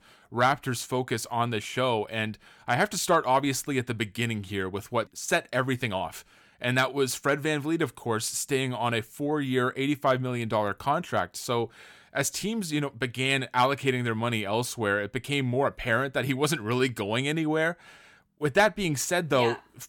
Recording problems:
none

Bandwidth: 17.5 kHz